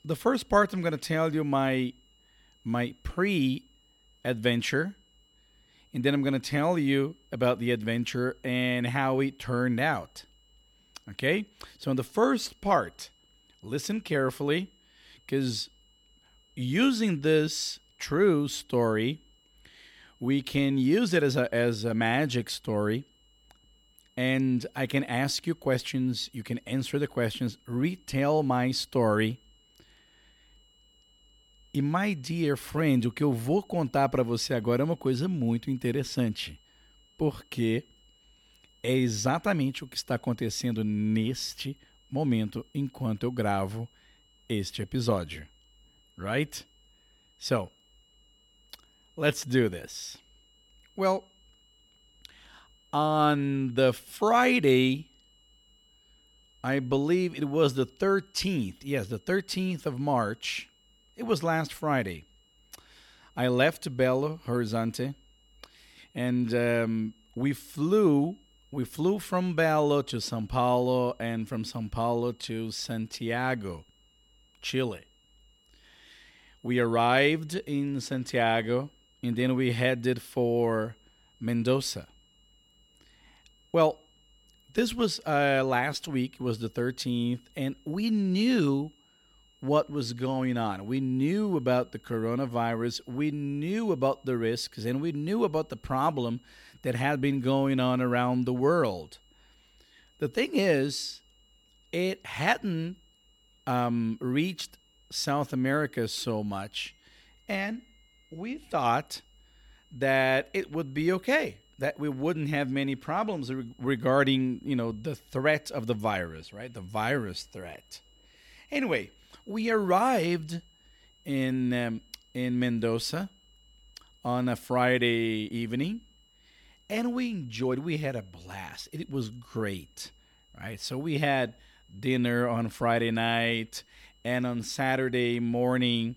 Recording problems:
high-pitched whine; faint; throughout; 3 kHz, 35 dB below the speech

